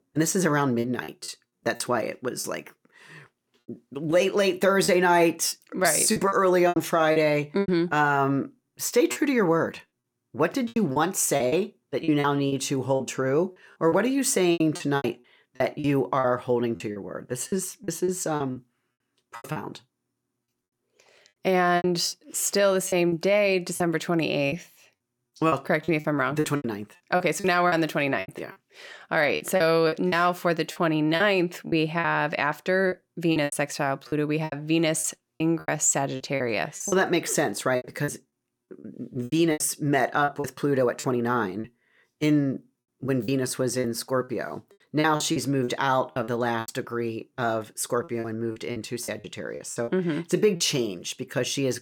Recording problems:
choppy; very; 11% of the speech affected

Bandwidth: 18 kHz